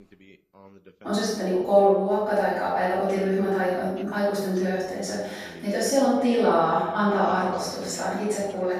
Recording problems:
room echo; strong; dies away in 0.9 s
off-mic speech; far
voice in the background; faint; throughout; 25 dB below the speech

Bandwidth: 14 kHz